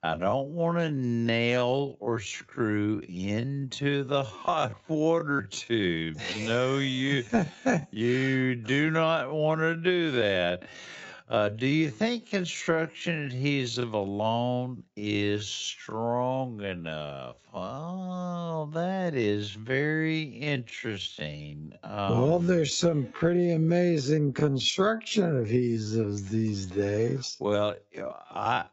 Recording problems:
wrong speed, natural pitch; too slow; 0.5 times normal speed
high frequencies cut off; noticeable; nothing above 7.5 kHz

